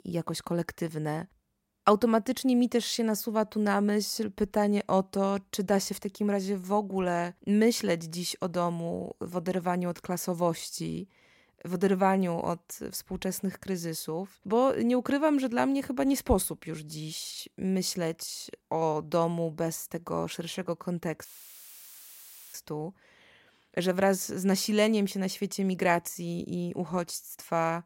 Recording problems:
audio cutting out; filled with static; at 21 s for 1.5 s

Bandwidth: 16 kHz